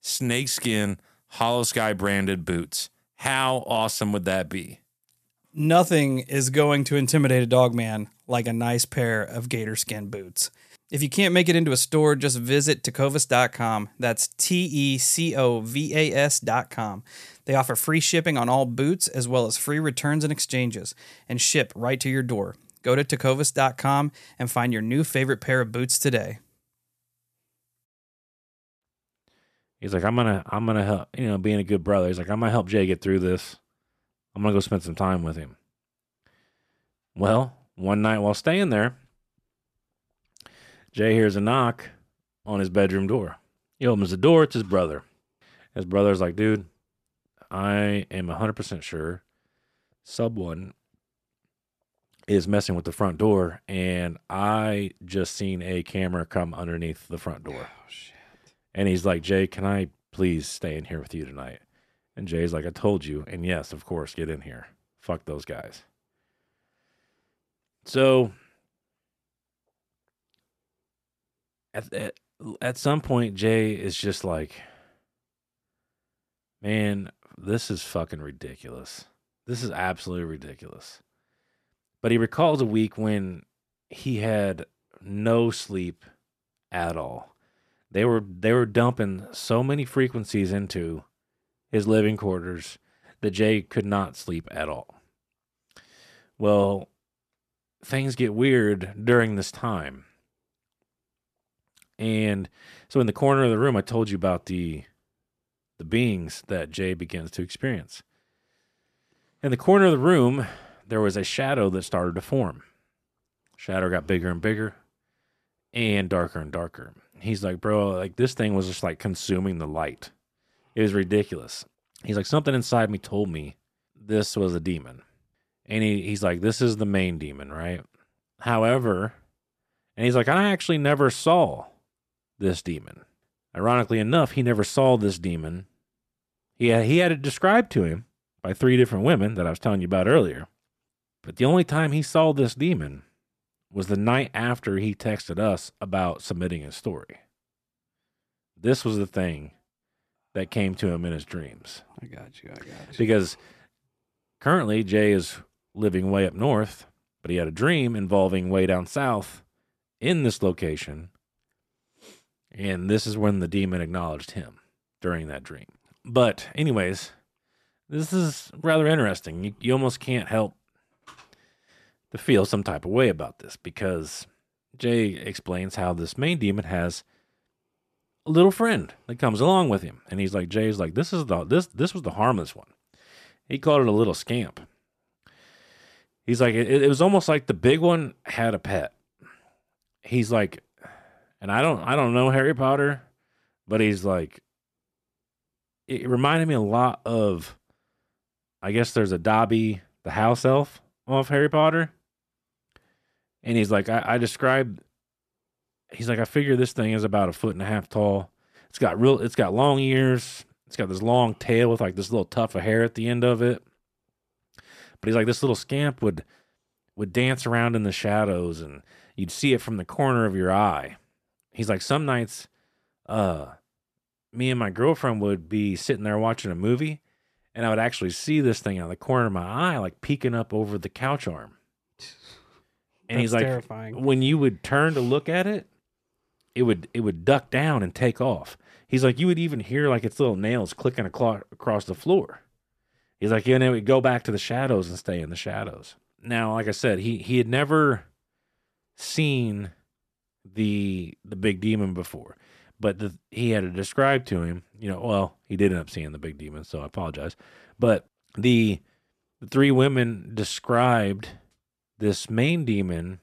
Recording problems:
none

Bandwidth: 14 kHz